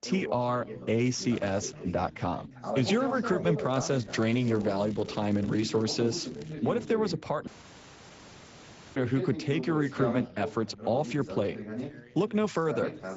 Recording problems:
high frequencies cut off; noticeable; nothing above 7.5 kHz
garbled, watery; slightly
background chatter; loud; throughout; 2 voices, 8 dB below the speech
crackling; faint; at 1 s and from 3.5 to 6.5 s; 25 dB below the speech
audio cutting out; at 7.5 s for 1.5 s

